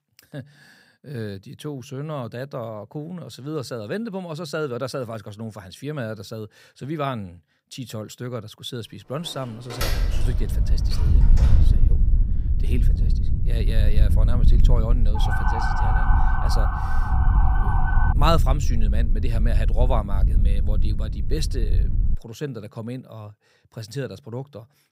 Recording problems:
wind noise on the microphone; heavy; from 10 to 22 s; 8 dB below the speech
door banging; loud; from 9 to 12 s; peak 2 dB above the speech
siren; loud; from 15 to 18 s; peak 4 dB above the speech

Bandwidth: 15.5 kHz